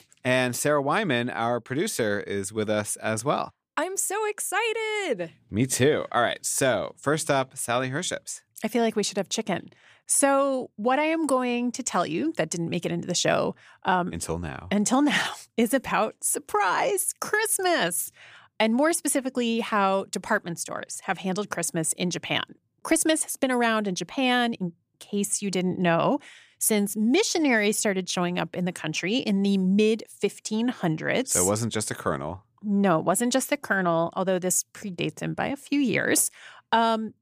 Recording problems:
none

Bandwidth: 15 kHz